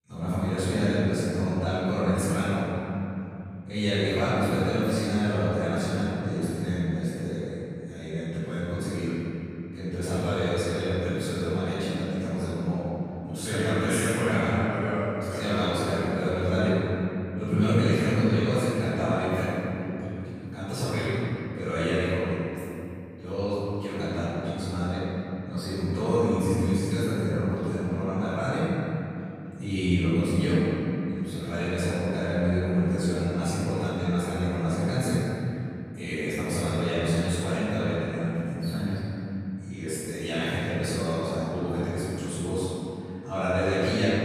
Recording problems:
room echo; strong; dies away in 3 s
off-mic speech; far

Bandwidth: 15 kHz